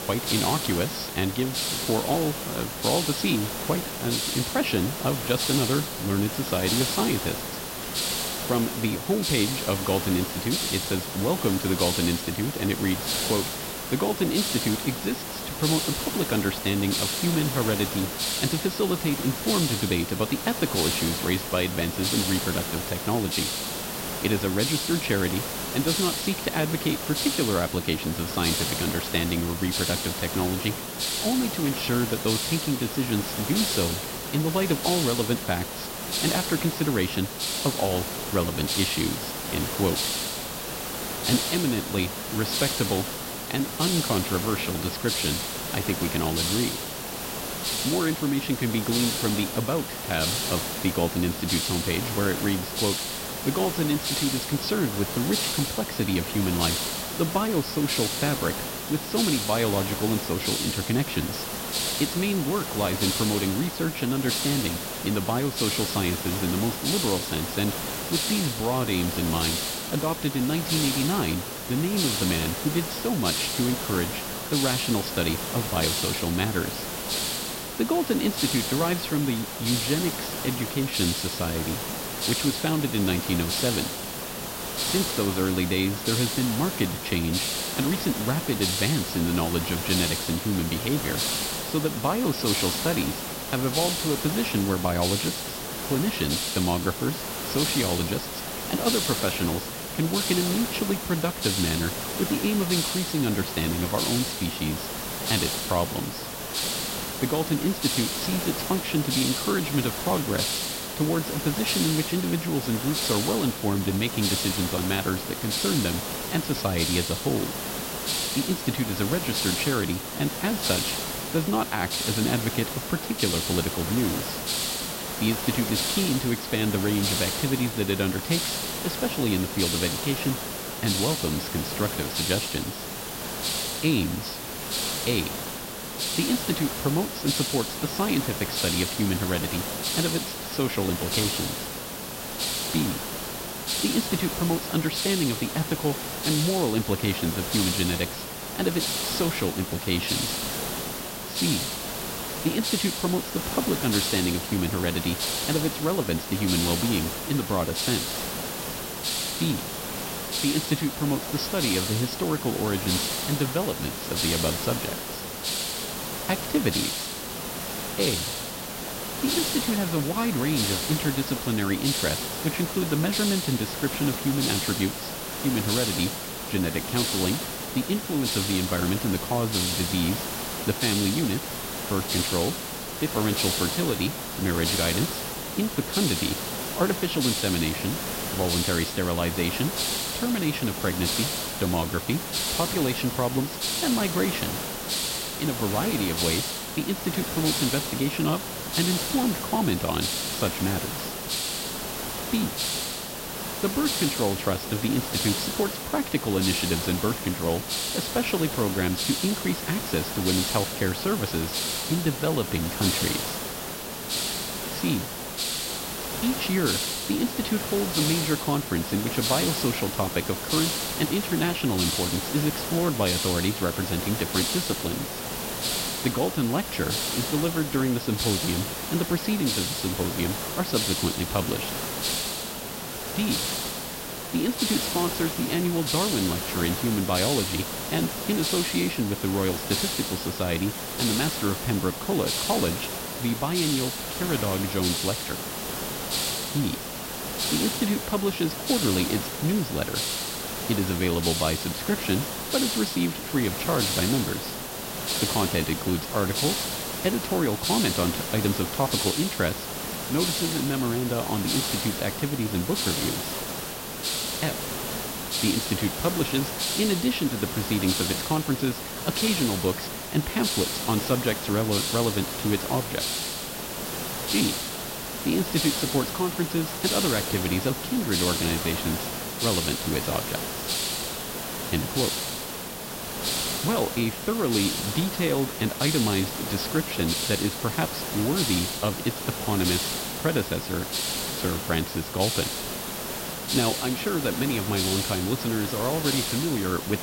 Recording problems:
high frequencies cut off; noticeable; nothing above 5.5 kHz
hiss; loud; throughout; 1 dB below the speech

